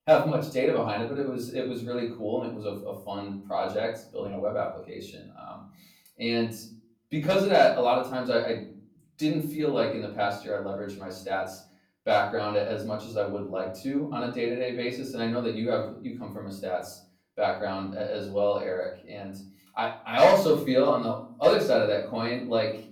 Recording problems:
off-mic speech; far
room echo; slight; dies away in 0.4 s

